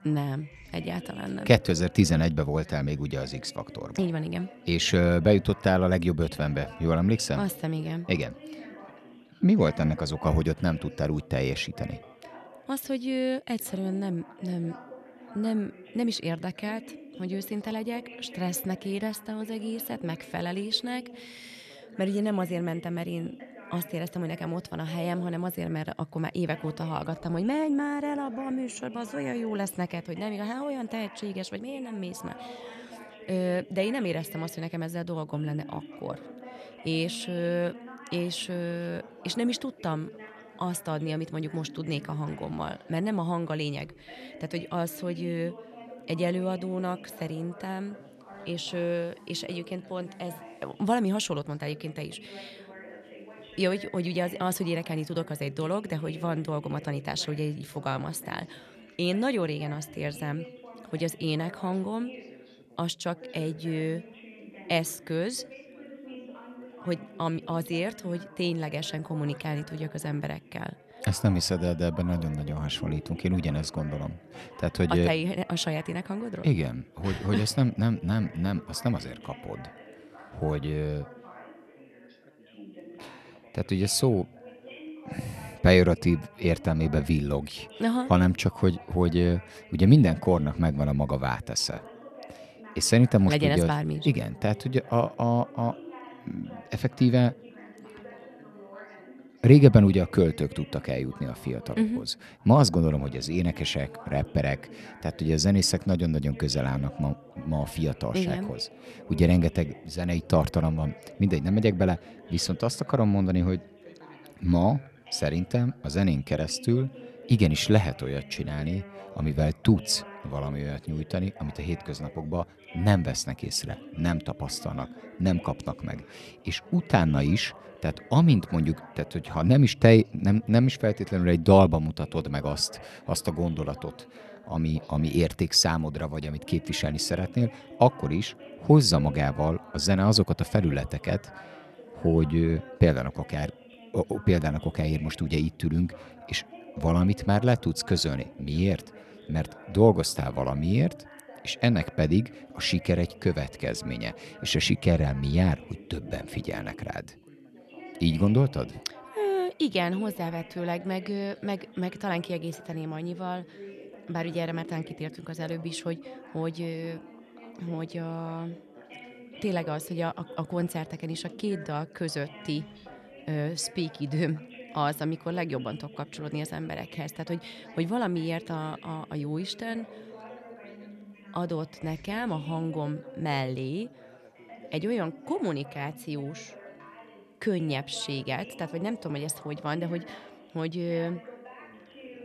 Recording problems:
background chatter; noticeable; throughout; 4 voices, 20 dB below the speech

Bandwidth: 13.5 kHz